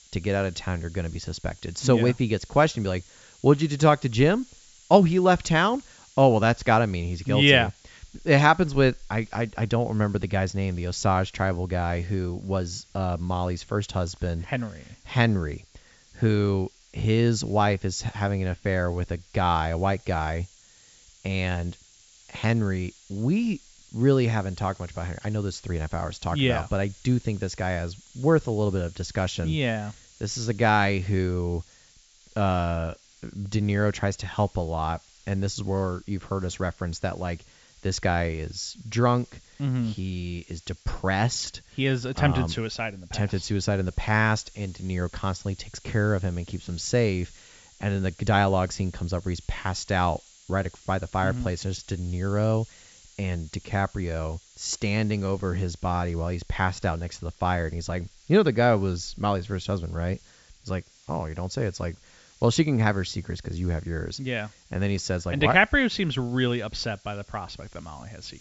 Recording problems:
high frequencies cut off; noticeable; nothing above 8 kHz
hiss; faint; throughout; 25 dB below the speech

